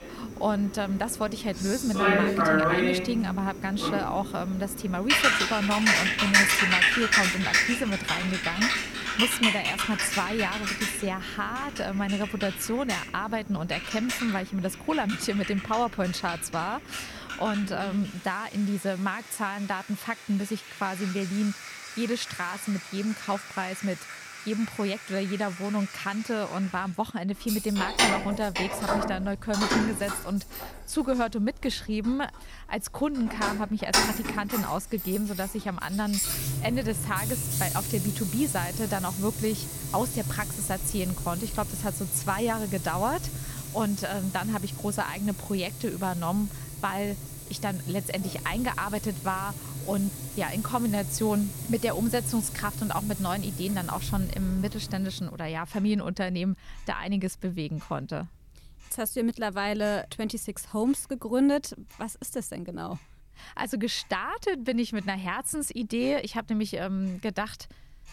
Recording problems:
household noises; very loud; throughout; as loud as the speech

